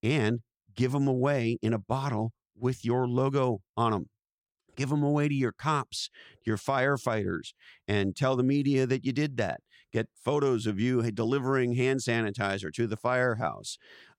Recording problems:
none

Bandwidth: 16.5 kHz